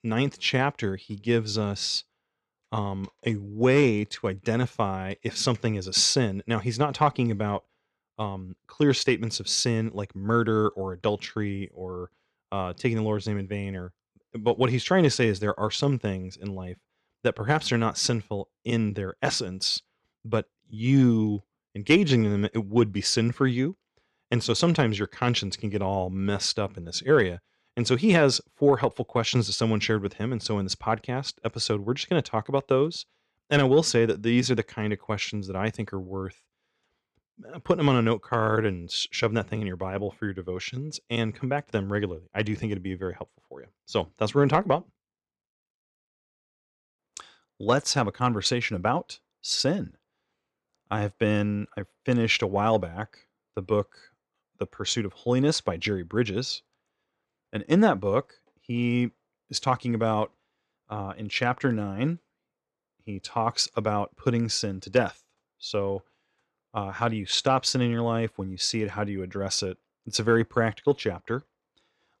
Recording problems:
none

